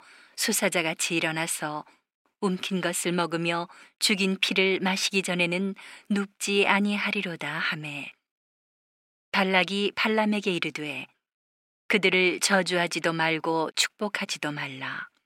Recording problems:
thin; somewhat; fading below 250 Hz

